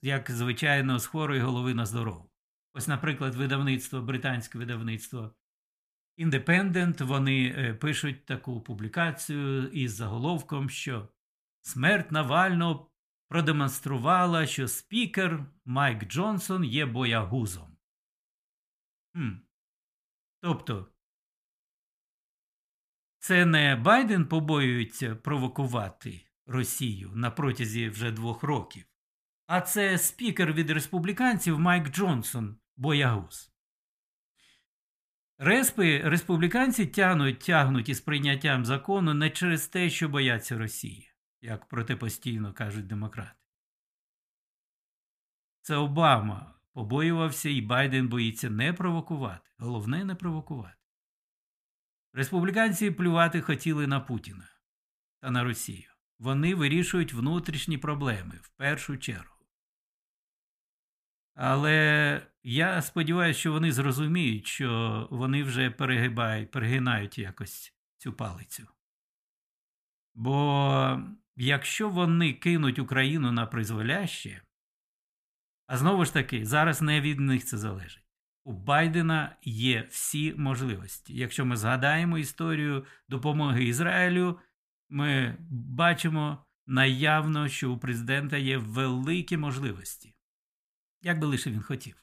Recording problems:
none

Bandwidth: 15 kHz